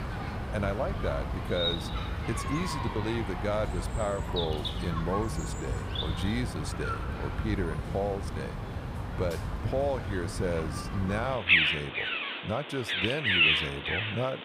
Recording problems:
animal sounds; very loud; throughout; 3 dB above the speech

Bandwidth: 15.5 kHz